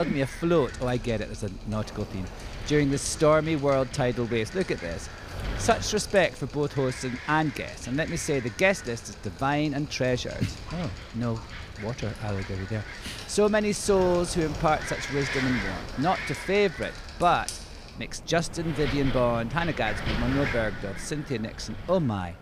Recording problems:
wind noise on the microphone; heavy; 10 dB below the speech
rain or running water; noticeable; throughout; 15 dB below the speech
abrupt cut into speech; at the start

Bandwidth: 15 kHz